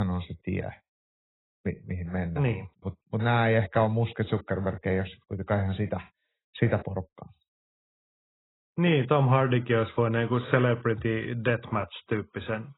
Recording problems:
garbled, watery; badly; nothing above 4 kHz
abrupt cut into speech; at the start

